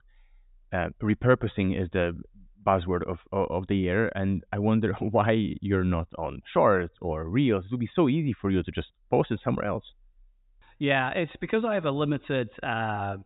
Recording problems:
high frequencies cut off; severe; nothing above 4 kHz

